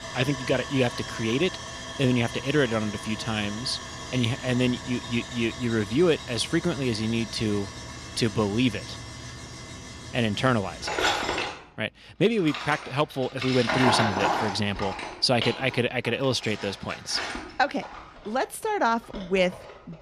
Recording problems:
machinery noise; loud; throughout; 6 dB below the speech

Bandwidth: 14 kHz